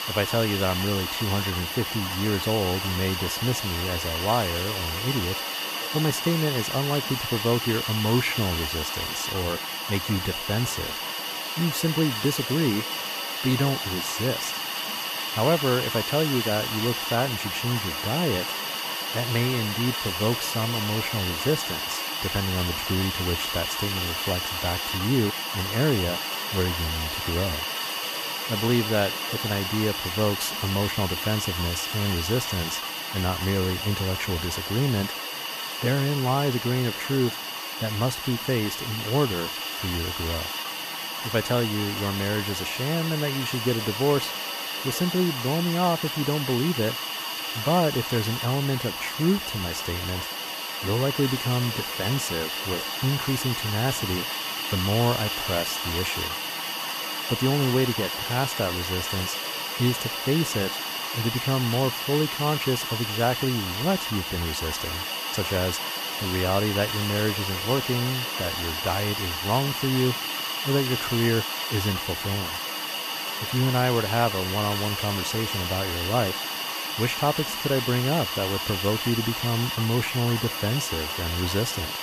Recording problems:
hiss; loud; throughout; 1 dB below the speech

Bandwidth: 14.5 kHz